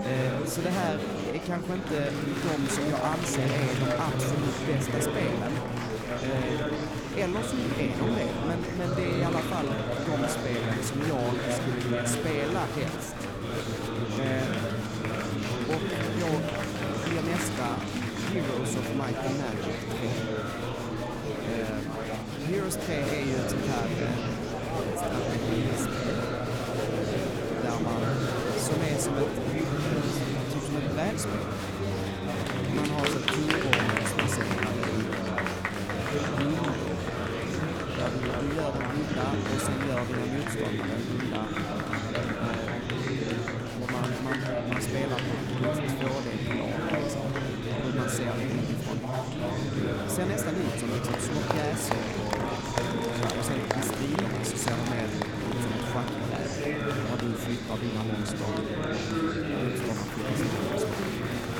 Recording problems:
murmuring crowd; very loud; throughout; 4 dB above the speech
low rumble; faint; throughout; 20 dB below the speech

